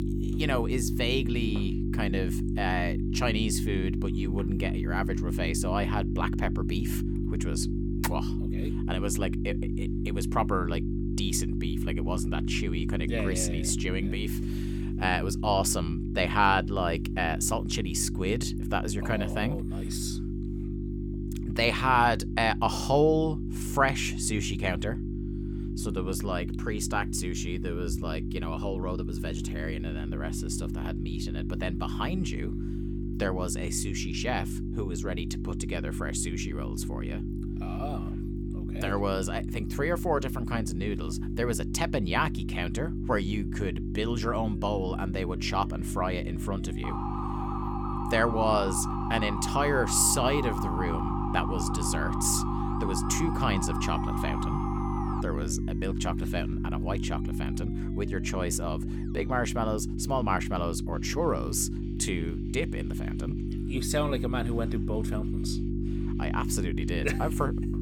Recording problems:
electrical hum; loud; throughout; 50 Hz, 9 dB below the speech
background music; faint; throughout; 30 dB below the speech
siren; noticeable; from 47 to 55 s; peak 4 dB below the speech

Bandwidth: 17.5 kHz